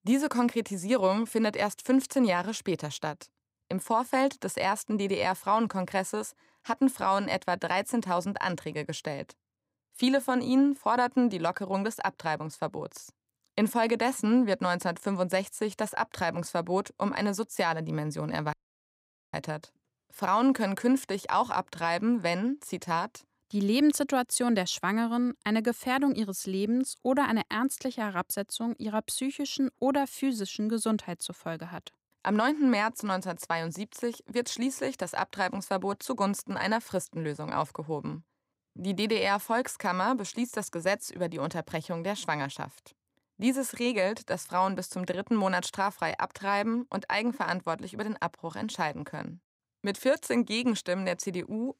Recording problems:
audio cutting out; at 19 s for 1 s

